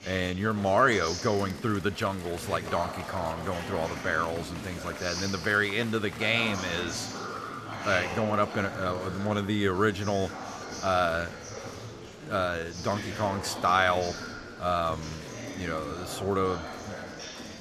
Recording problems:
murmuring crowd; loud; throughout; 9 dB below the speech

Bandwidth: 14 kHz